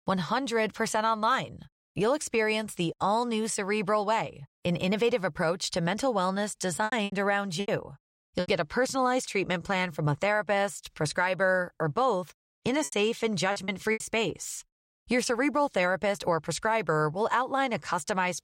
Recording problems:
choppy; very; from 7 to 8.5 s and from 13 to 14 s; 12% of the speech affected

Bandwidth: 16 kHz